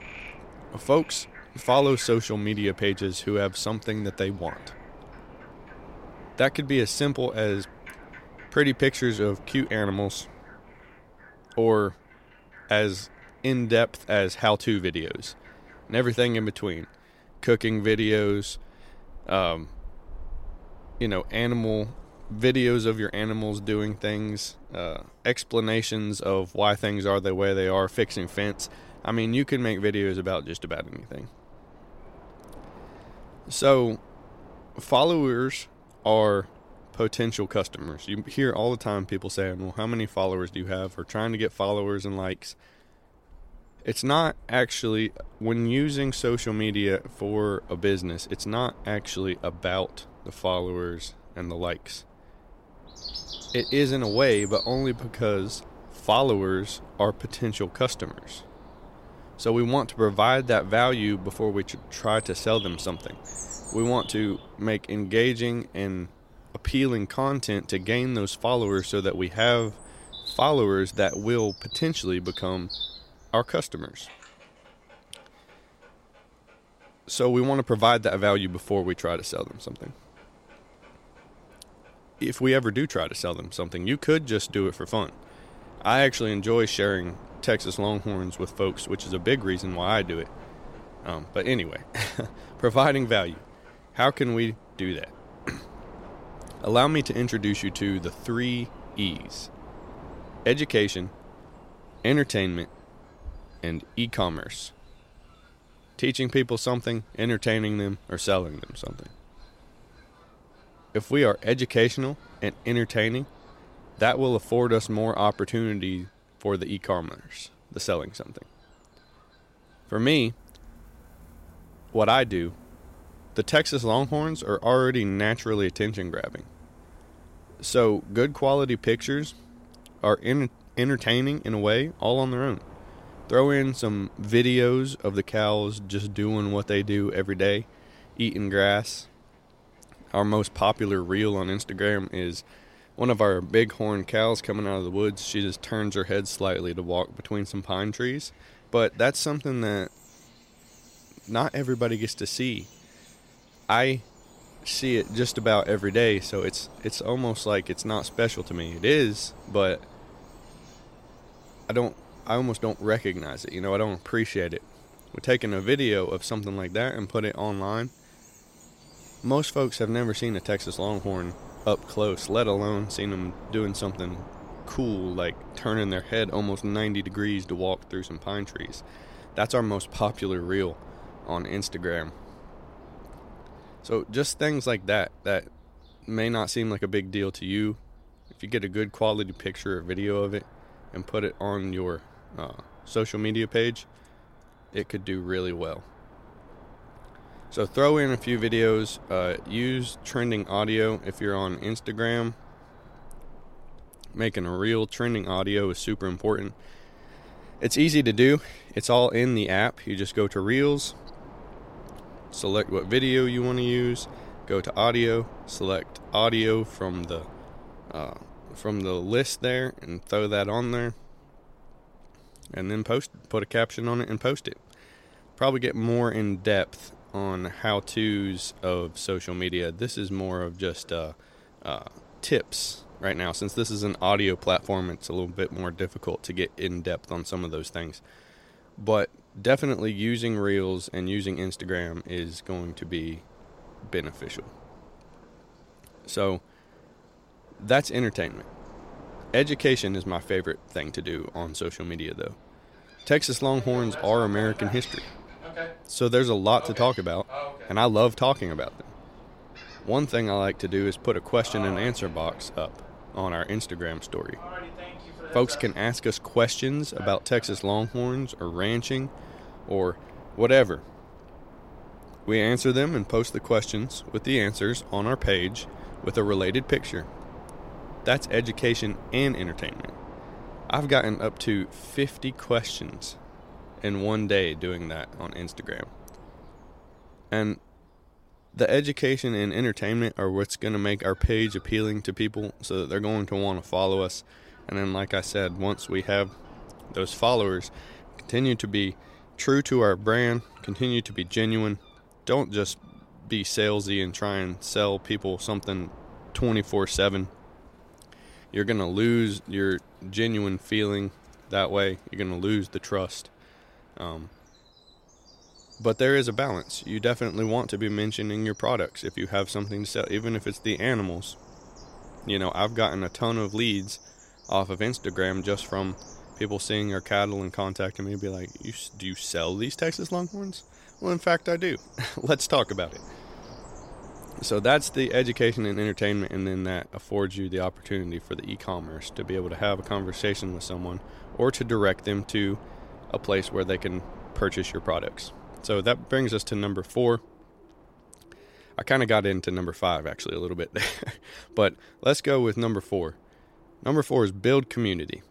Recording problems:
wind noise on the microphone; occasional gusts; 25 dB below the speech
animal sounds; faint; throughout; 20 dB below the speech

